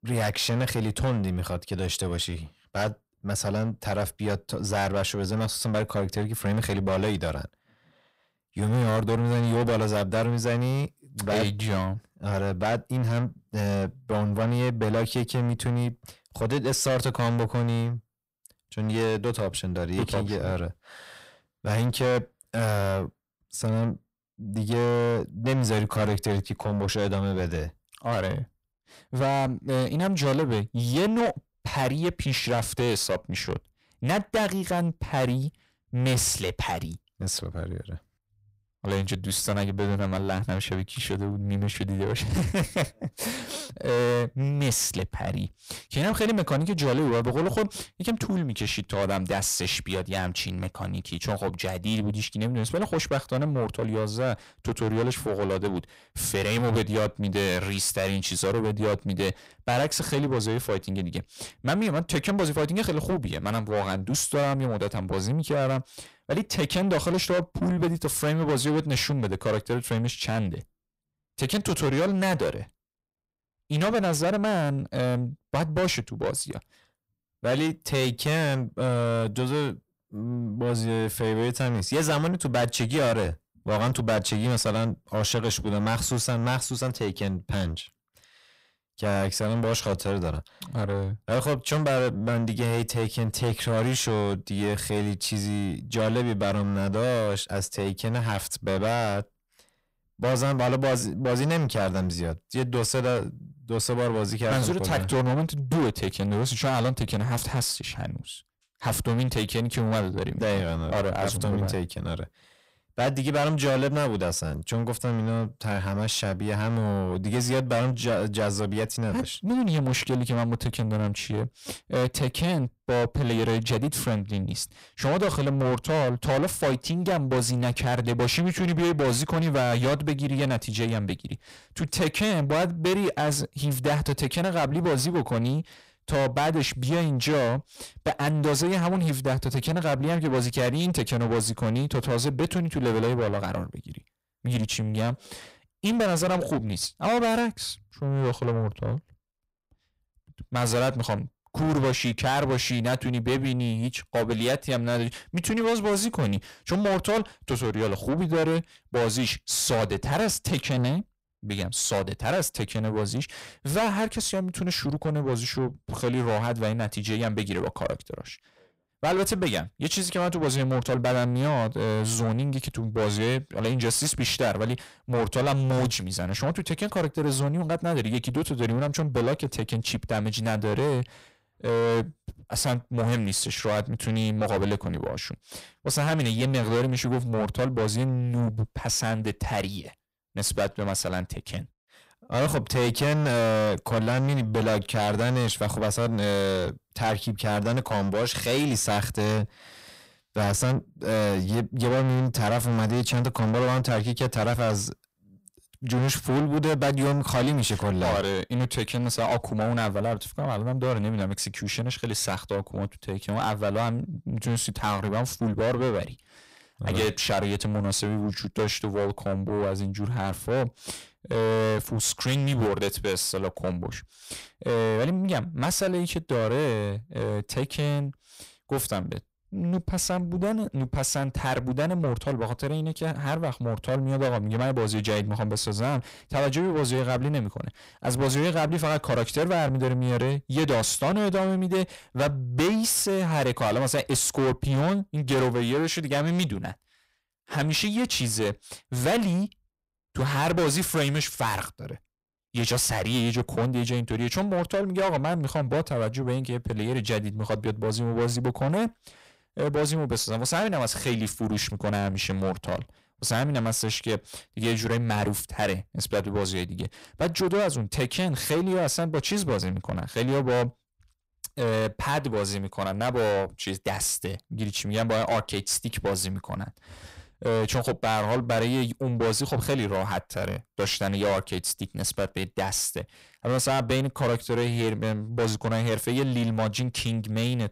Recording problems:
distortion; heavy; 6 dB below the speech

